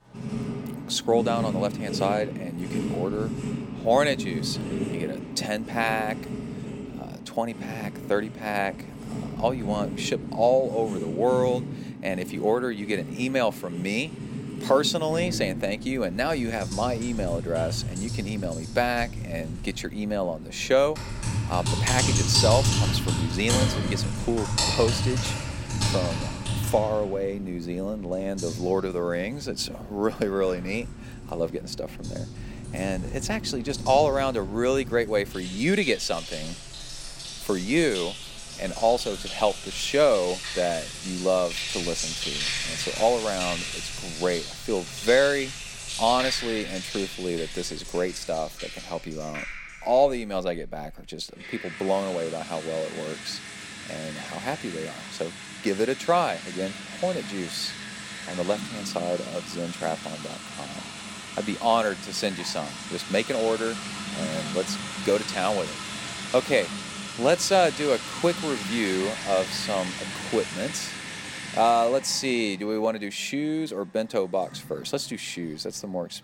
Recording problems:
household noises; loud; throughout; 5 dB below the speech

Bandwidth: 16.5 kHz